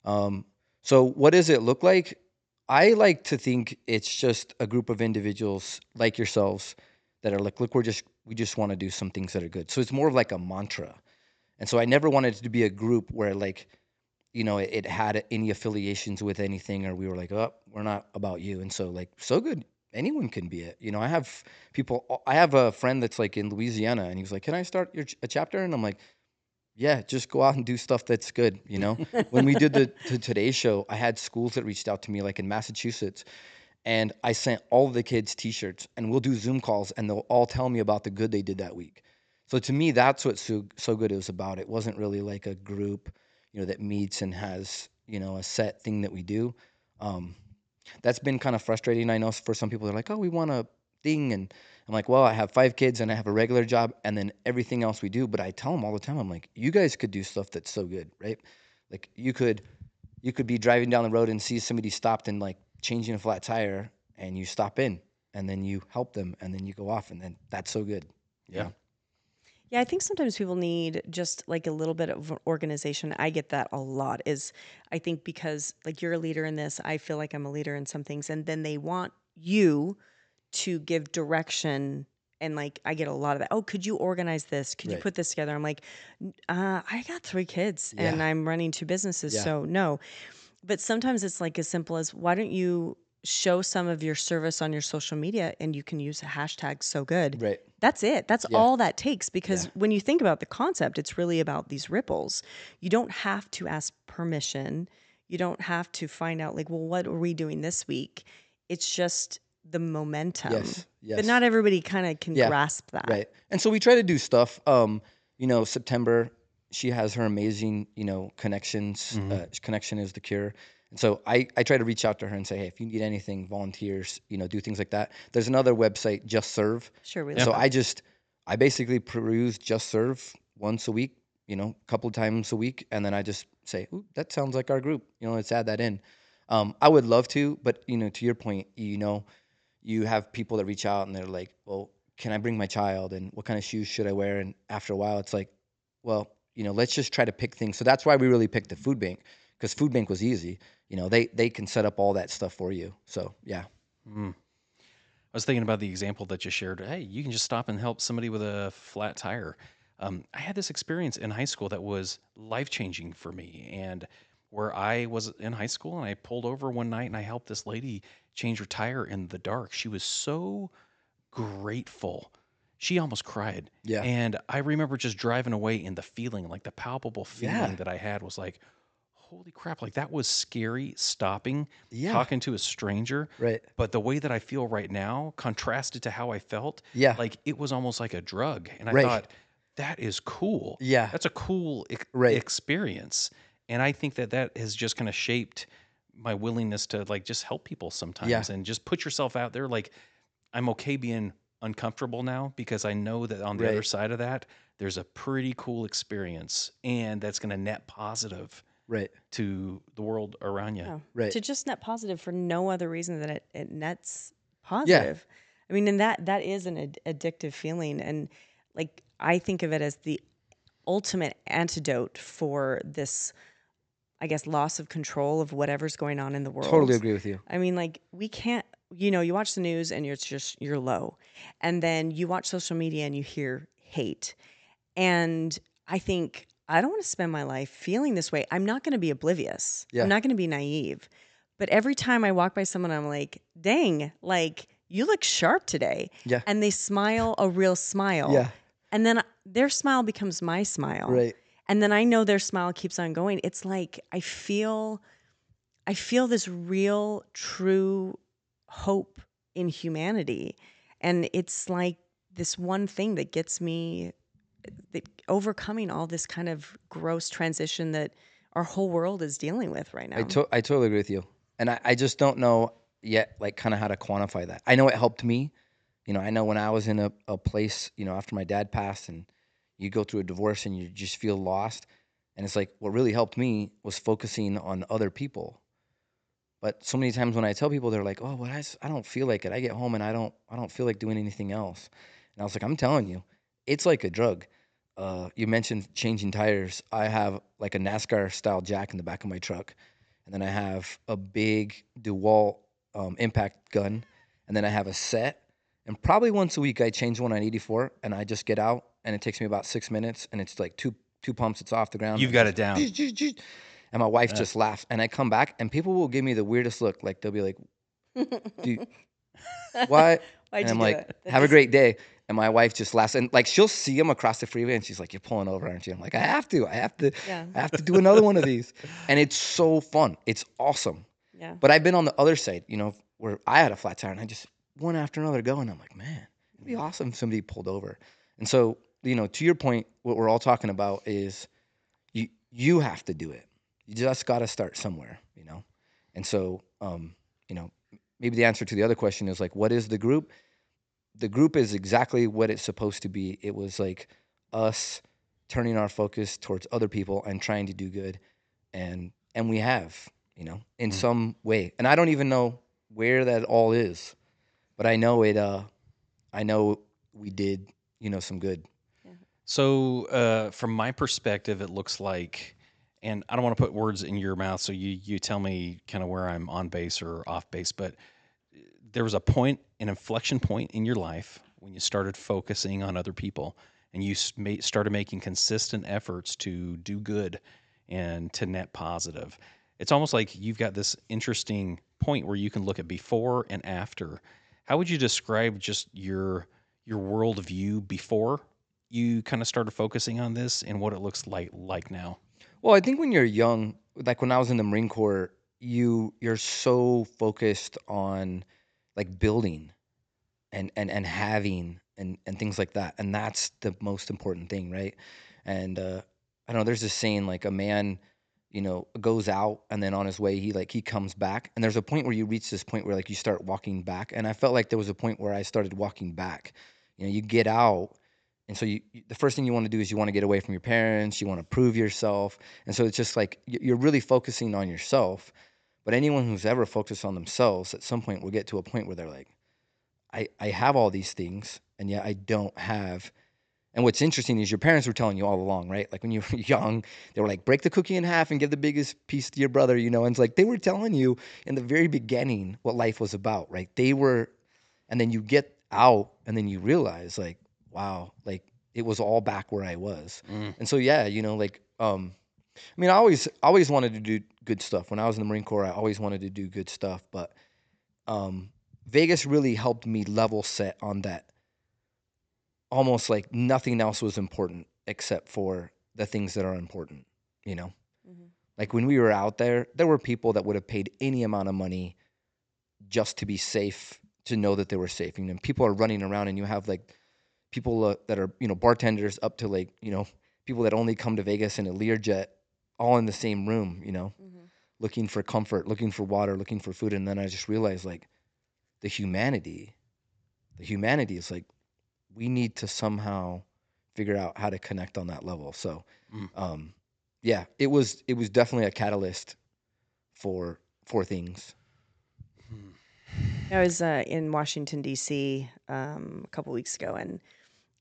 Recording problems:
high frequencies cut off; noticeable; nothing above 8 kHz

